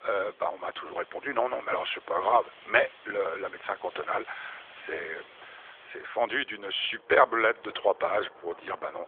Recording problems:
phone-call audio; nothing above 3.5 kHz
wind in the background; faint; throughout; 25 dB below the speech

